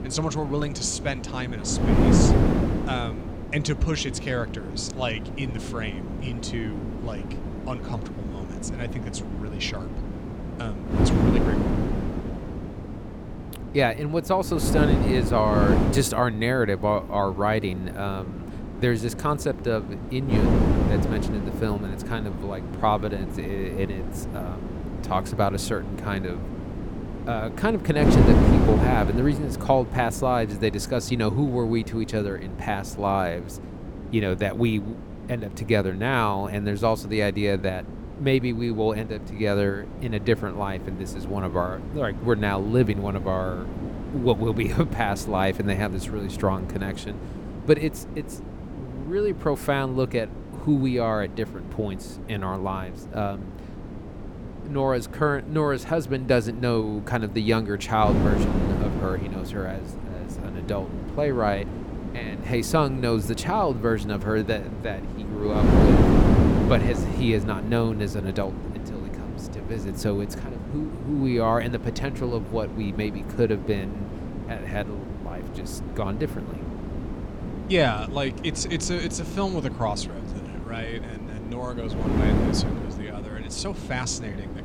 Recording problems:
wind noise on the microphone; heavy; 7 dB below the speech

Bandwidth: 18 kHz